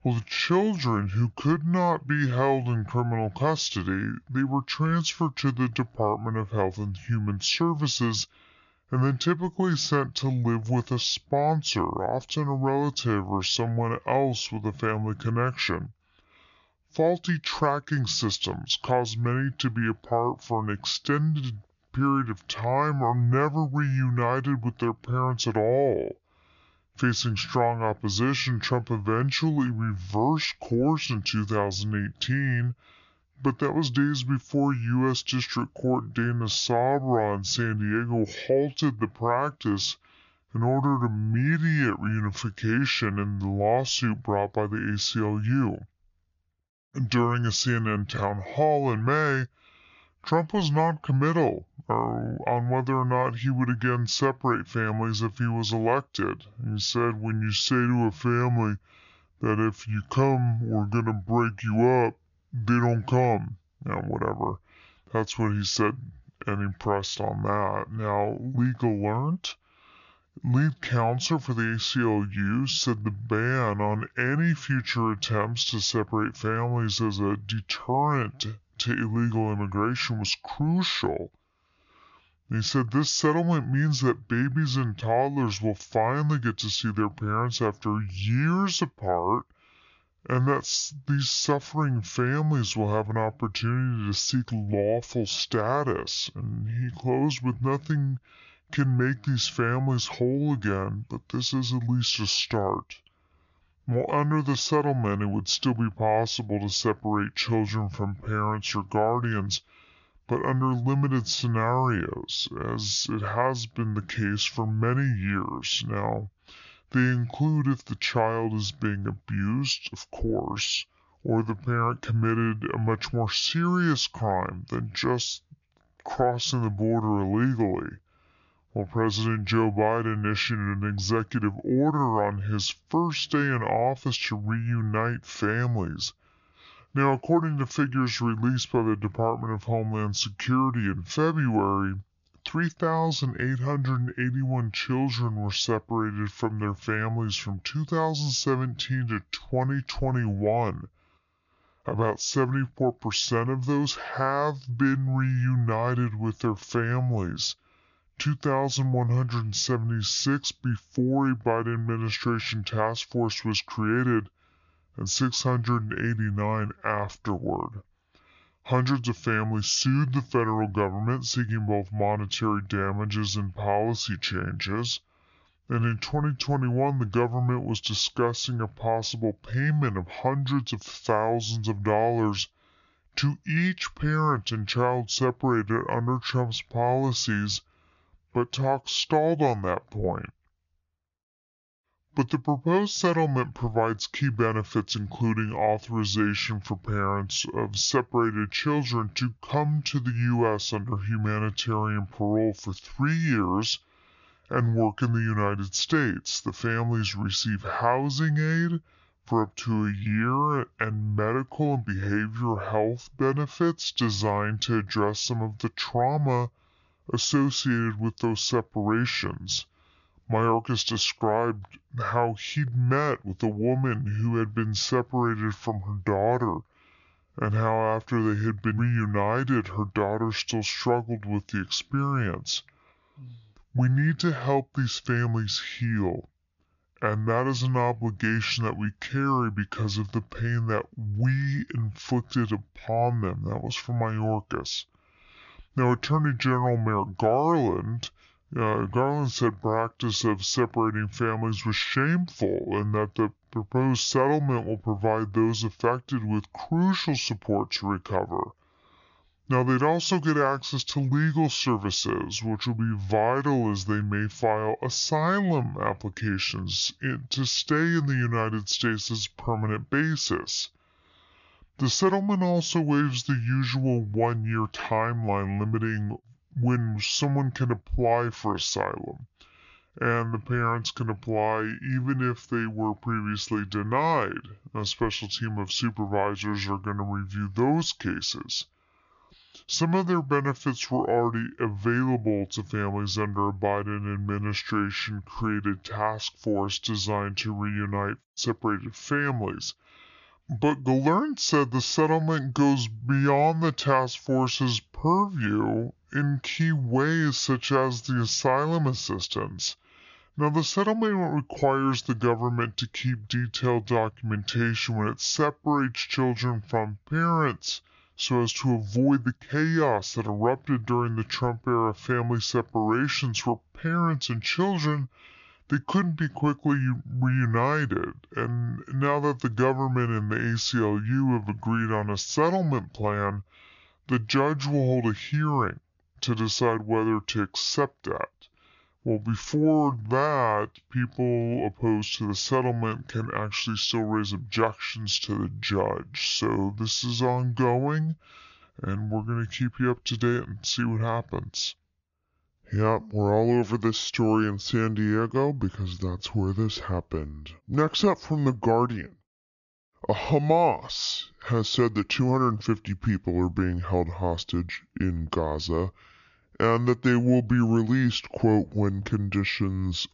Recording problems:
wrong speed and pitch; too slow and too low; 0.7 times normal speed
high frequencies cut off; noticeable; nothing above 7 kHz

